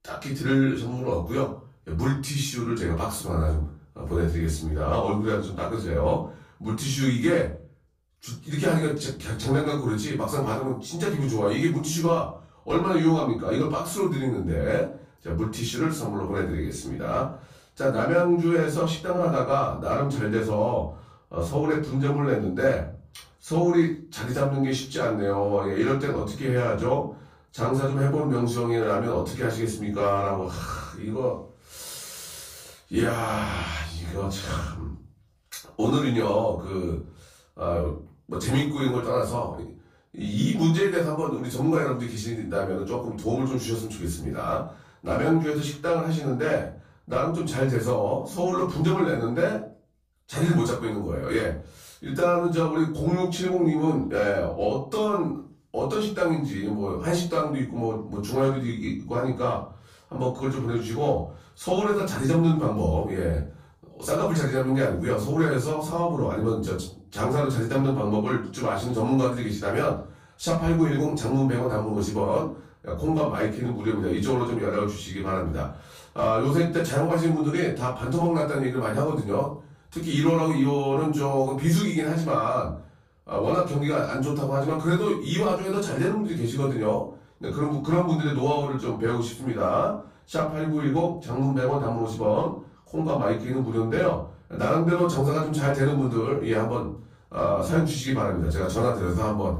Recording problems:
off-mic speech; far
room echo; noticeable; dies away in 0.4 s

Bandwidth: 15 kHz